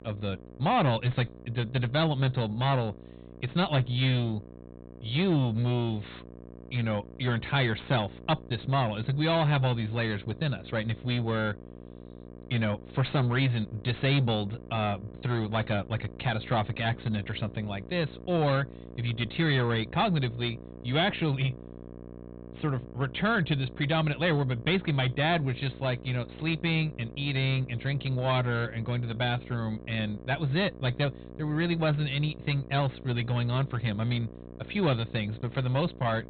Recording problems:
high frequencies cut off; severe; nothing above 4 kHz
distortion; slight; 8% of the sound clipped
electrical hum; noticeable; throughout; 60 Hz, 20 dB below the speech

